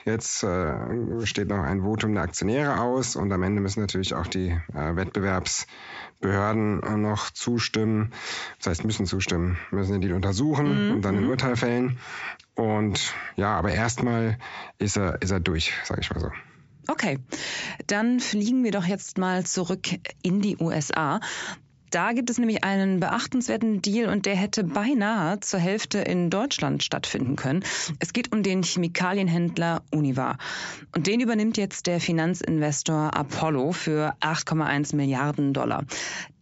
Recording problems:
squashed, flat; heavily
high frequencies cut off; noticeable; nothing above 8 kHz

